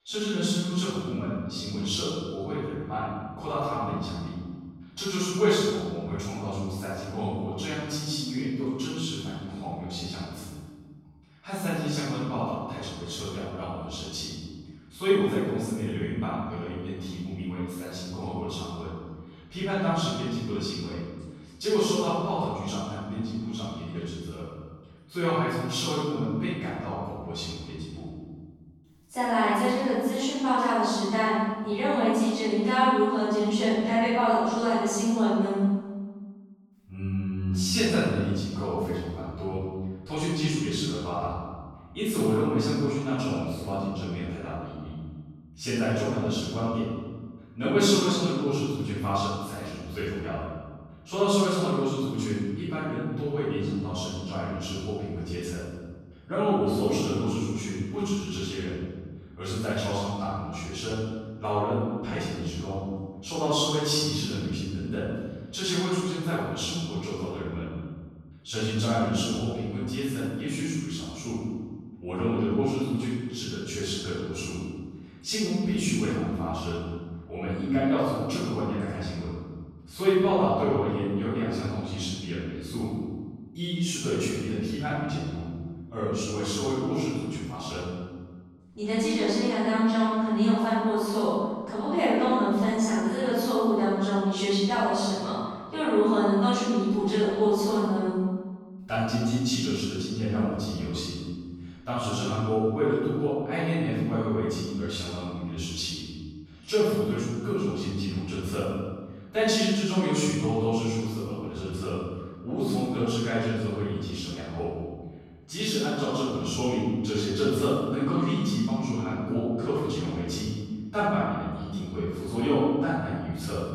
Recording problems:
room echo; strong; dies away in 1.4 s
off-mic speech; far

